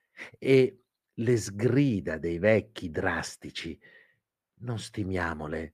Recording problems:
muffled; slightly; fading above 3 kHz

